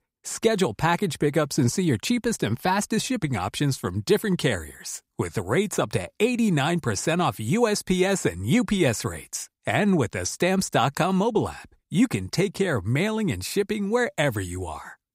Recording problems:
none

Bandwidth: 15.5 kHz